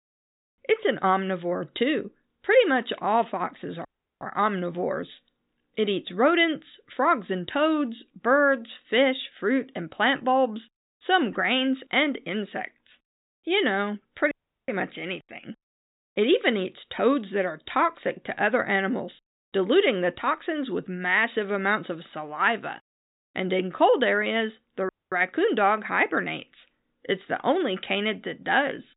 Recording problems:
high frequencies cut off; severe; nothing above 4 kHz
audio cutting out; at 4 s, at 14 s and at 25 s

